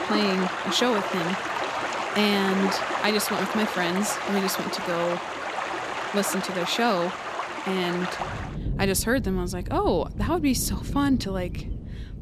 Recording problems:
rain or running water; loud; throughout; 4 dB below the speech

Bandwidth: 14 kHz